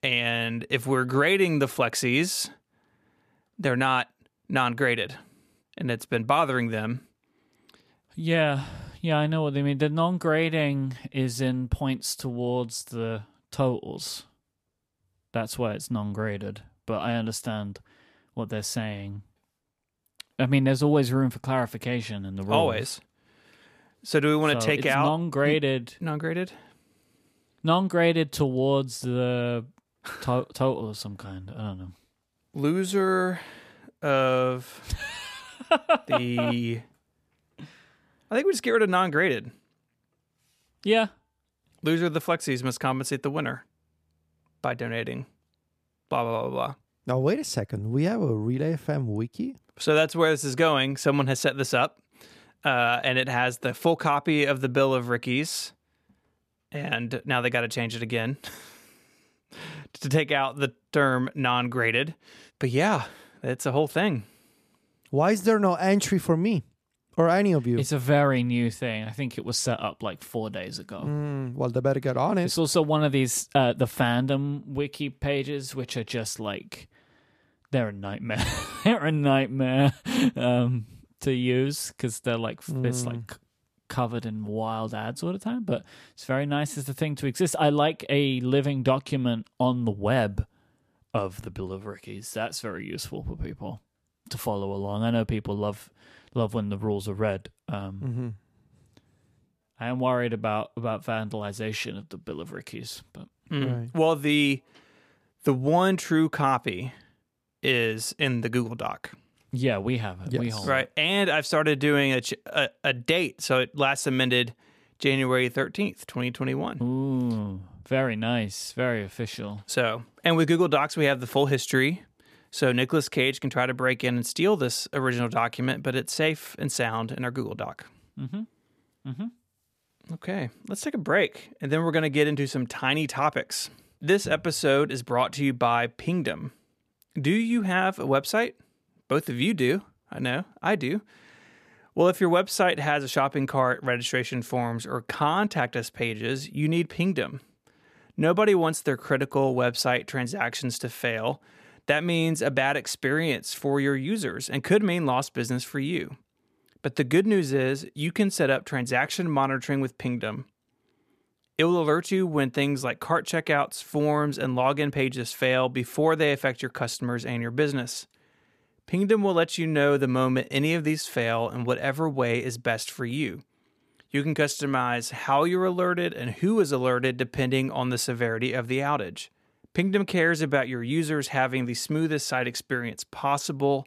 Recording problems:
none

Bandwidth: 14.5 kHz